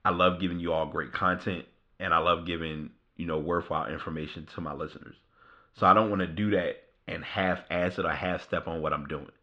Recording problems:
muffled; very; fading above 3.5 kHz

